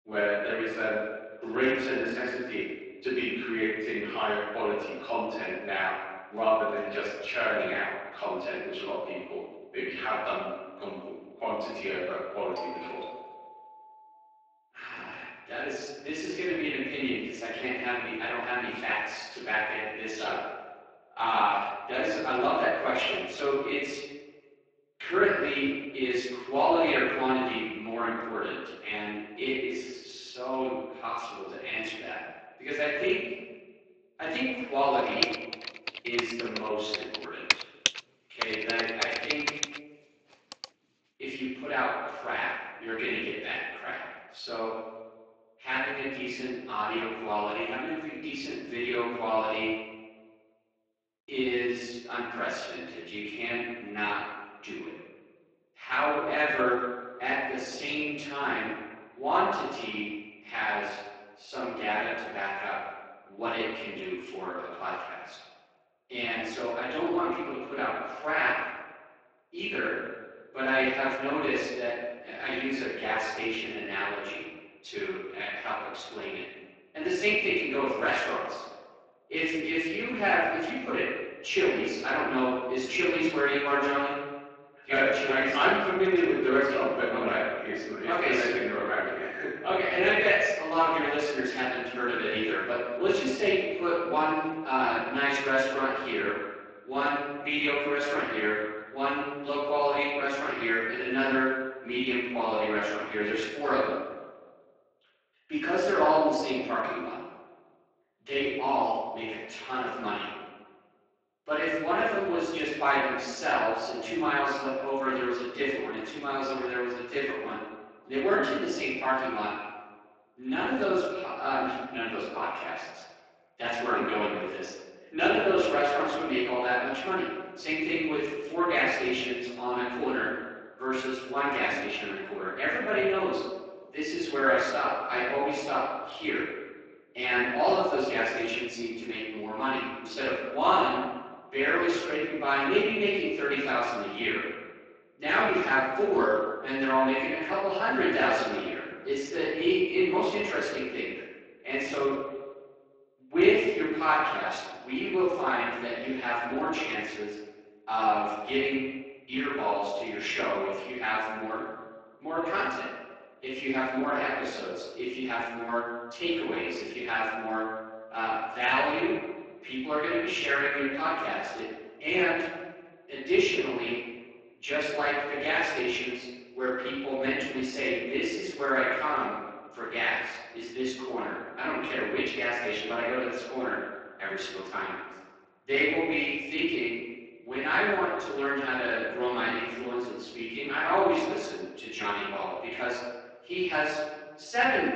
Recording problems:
room echo; strong; dies away in 1.2 s
off-mic speech; far
thin; somewhat; fading below 300 Hz
garbled, watery; slightly
doorbell; faint; from 13 to 14 s; peak 10 dB below the speech
keyboard typing; loud; from 35 to 41 s; peak 1 dB above the speech

